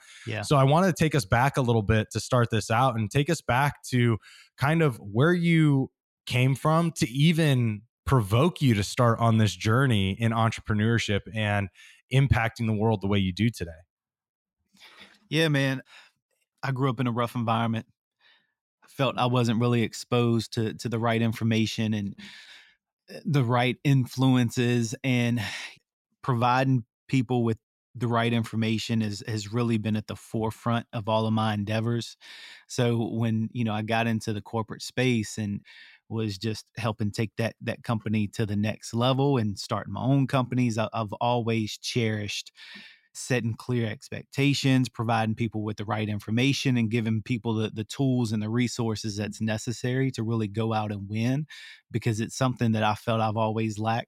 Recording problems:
none

